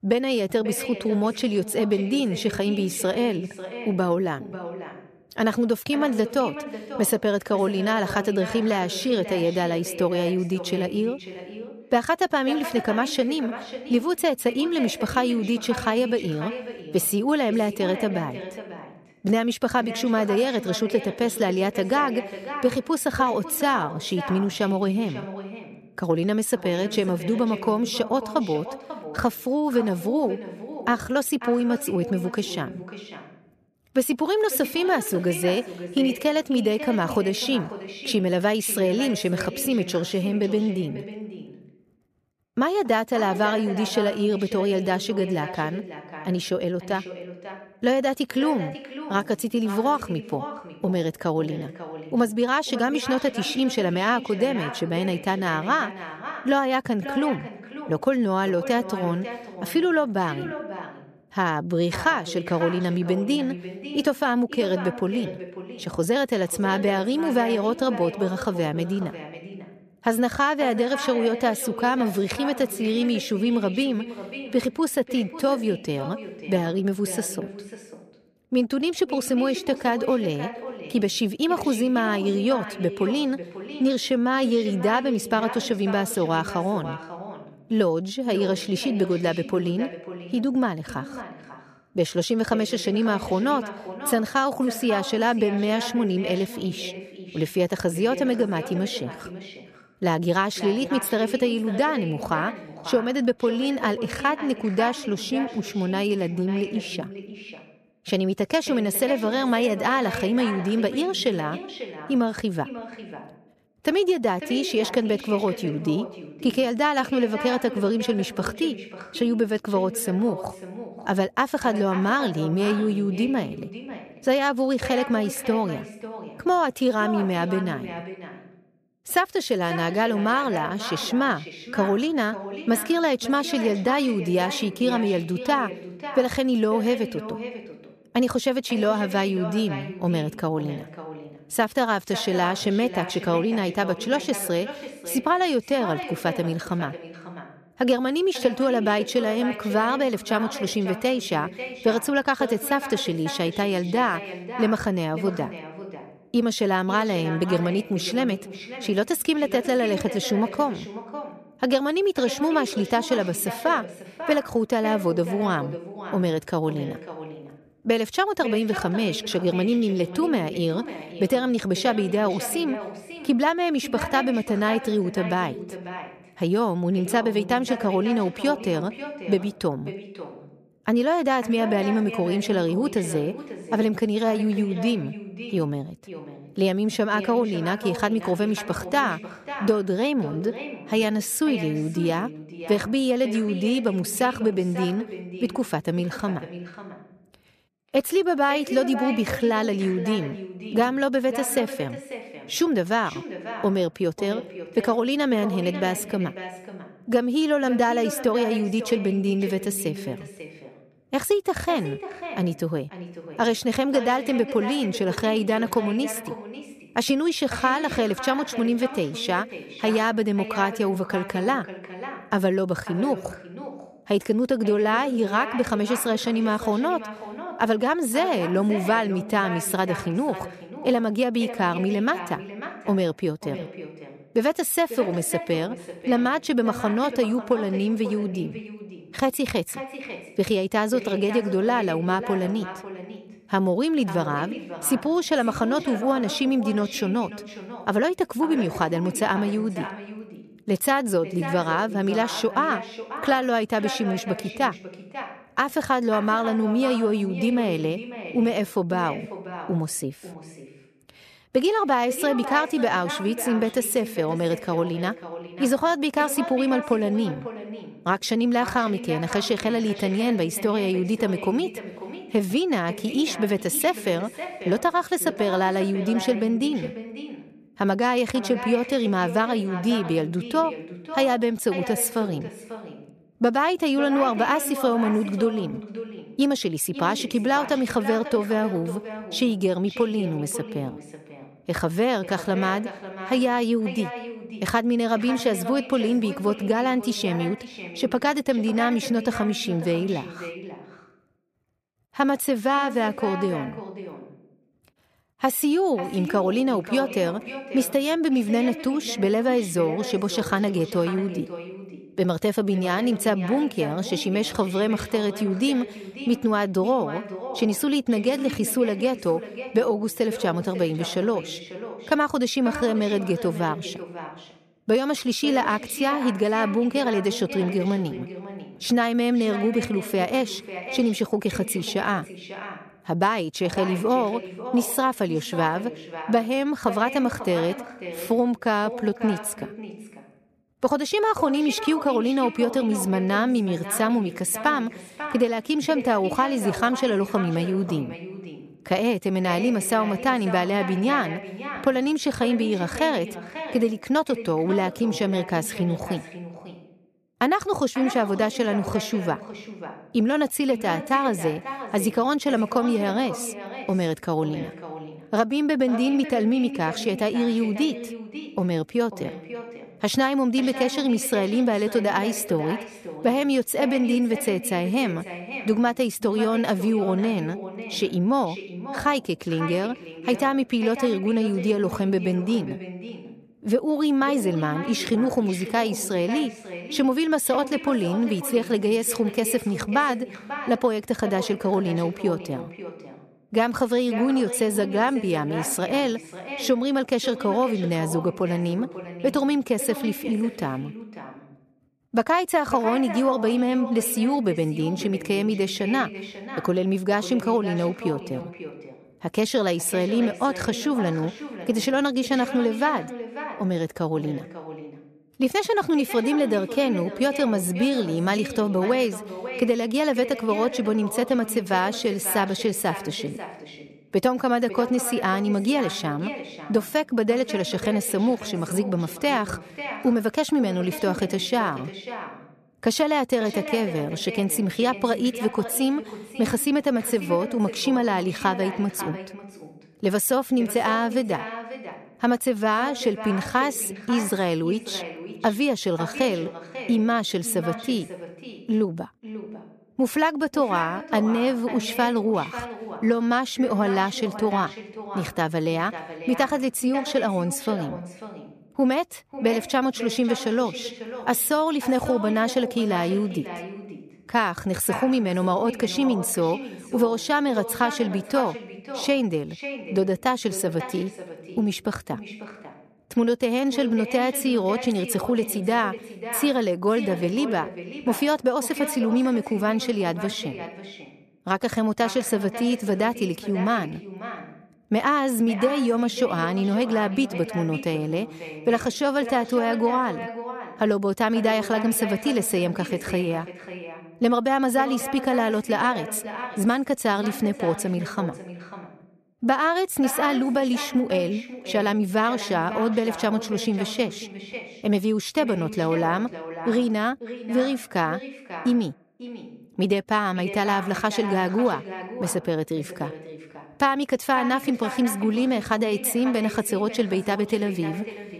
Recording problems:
echo of what is said; strong; throughout; 540 ms later, 10 dB below the speech

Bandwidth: 14.5 kHz